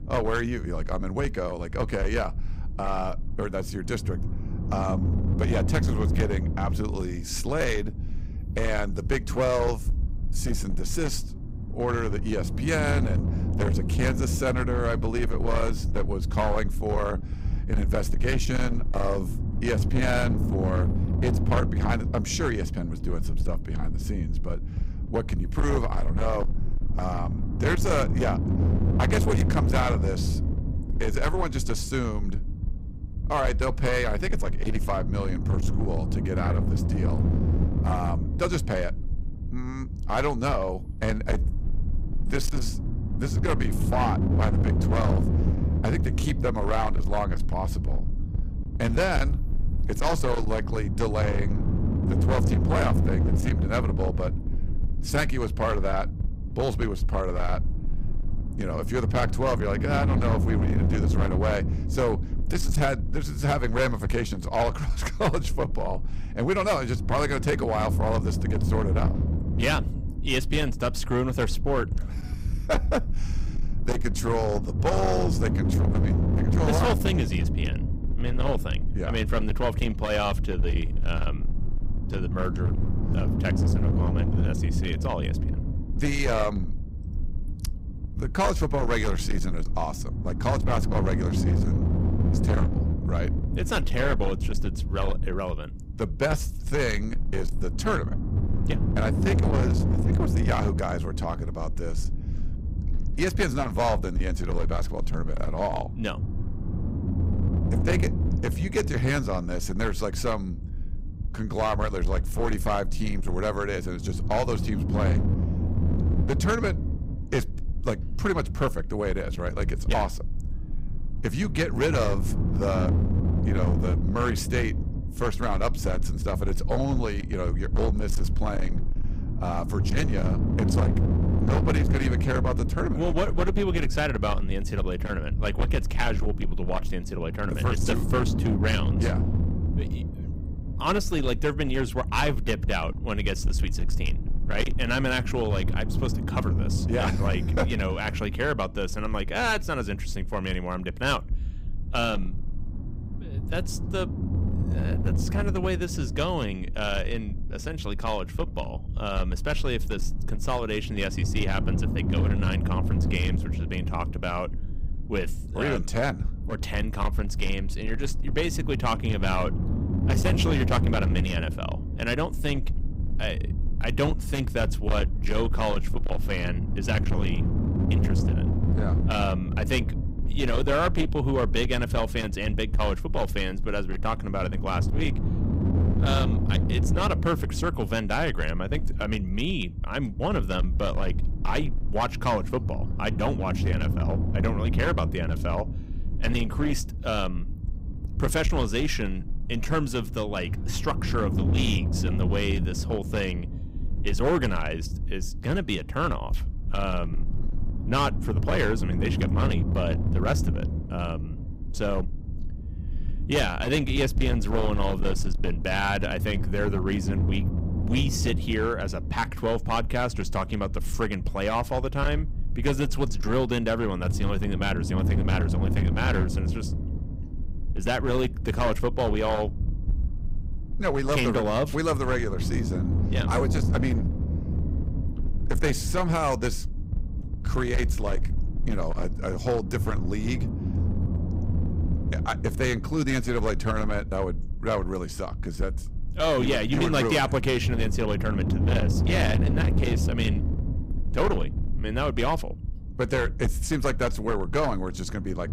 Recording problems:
distortion; slight; 12% of the sound clipped
low rumble; loud; throughout; 9 dB below the speech

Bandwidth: 15.5 kHz